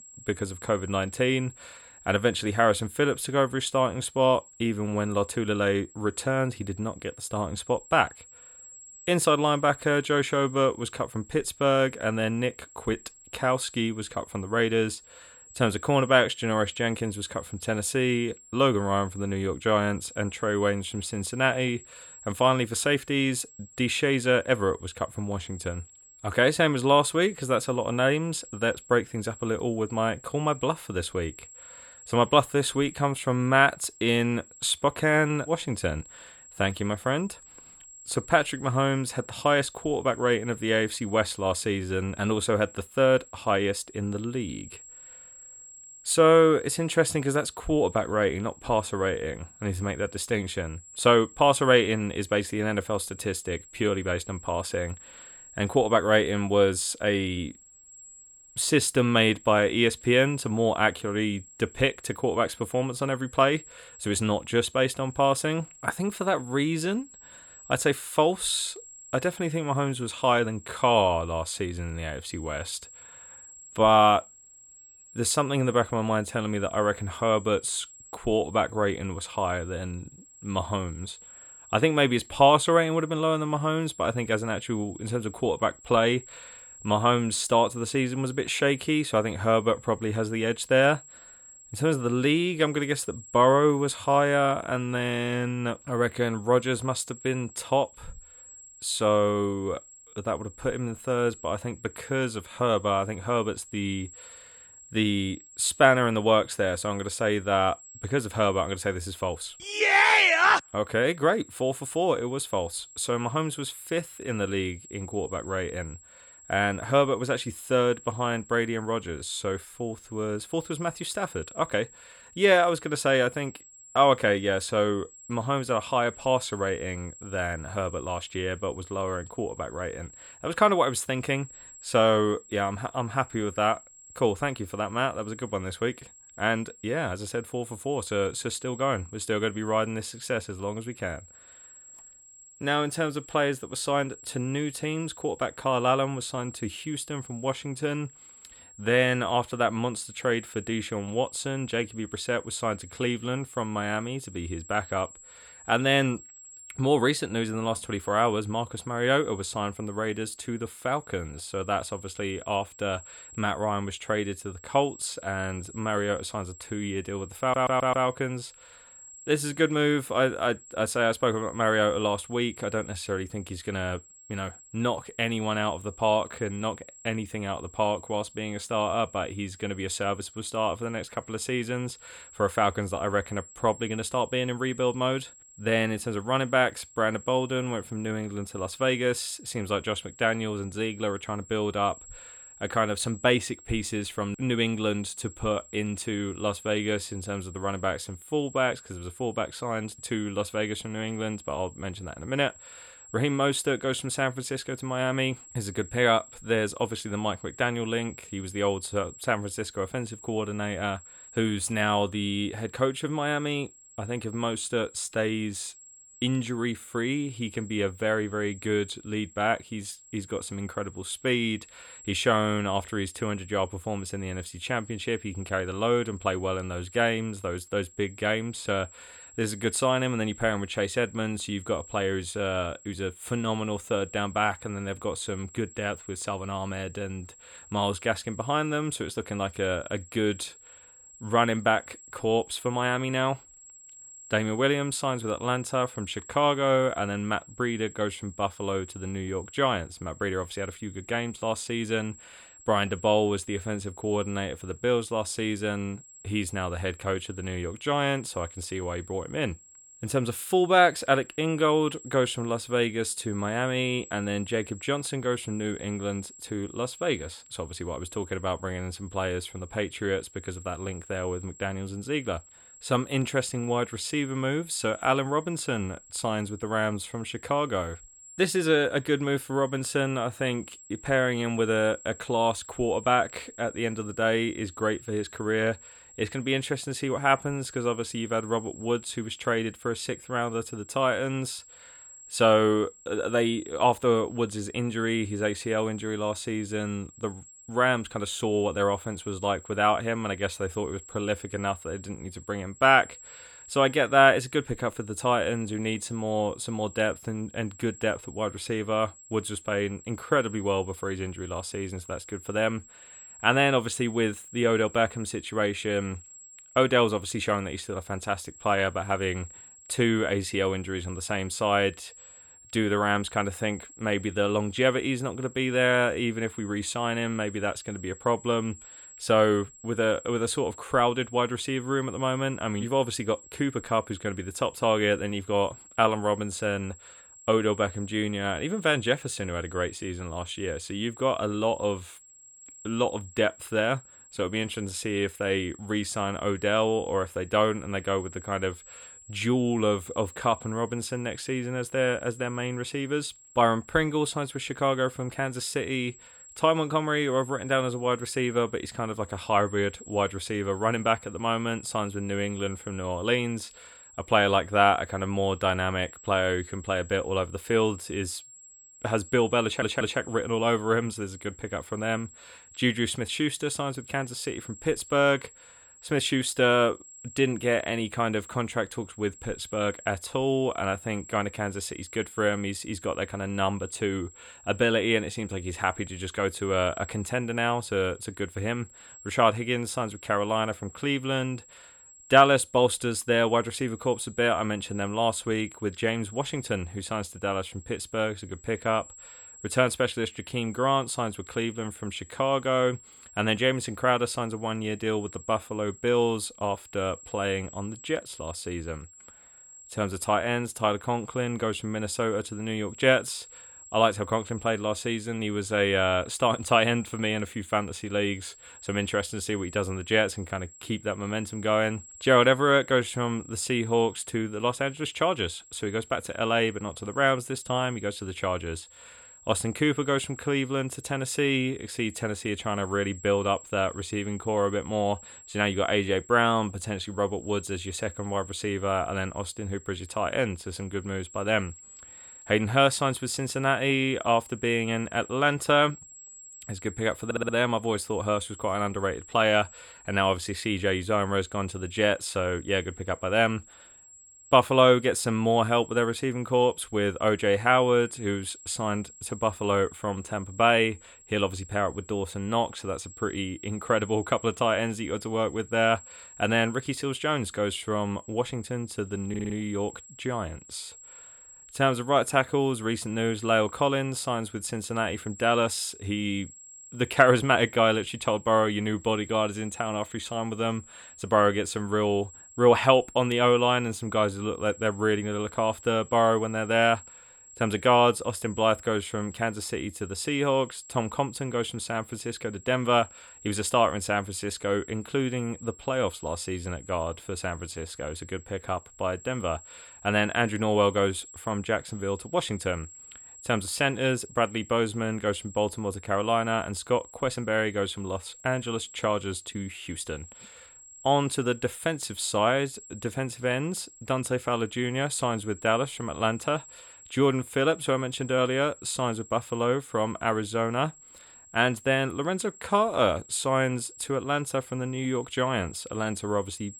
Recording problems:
high-pitched whine; noticeable; throughout; 7.5 kHz, 20 dB below the speech
audio stuttering; 4 times, first at 2:47

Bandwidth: 18.5 kHz